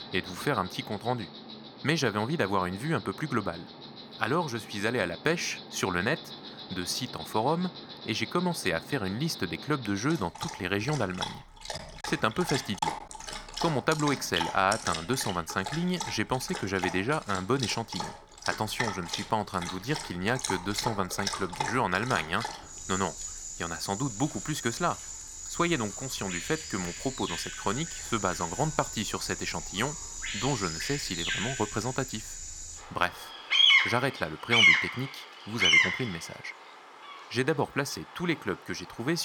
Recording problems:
animal sounds; loud; throughout; as loud as the speech
choppy; occasionally; at 13 s; 4% of the speech affected
abrupt cut into speech; at the end

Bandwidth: 18.5 kHz